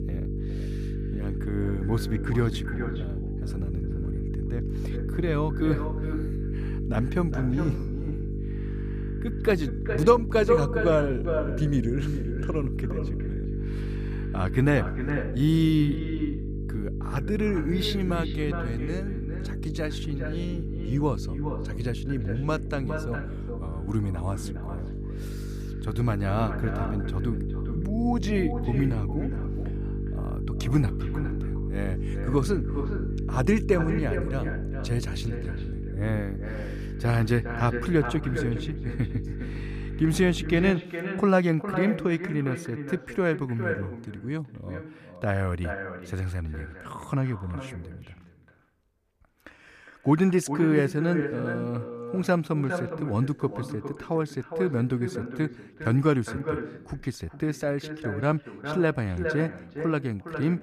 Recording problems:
echo of what is said; strong; throughout; 410 ms later, 8 dB below the speech
electrical hum; noticeable; until 41 s; 50 Hz, 10 dB below the speech

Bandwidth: 14.5 kHz